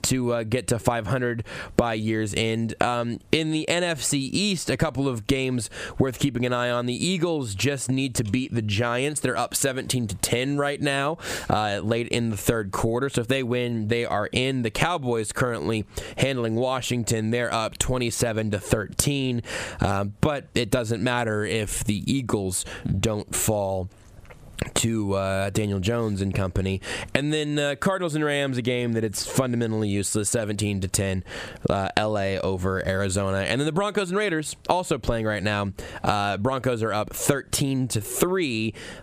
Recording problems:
squashed, flat; somewhat

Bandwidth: 15 kHz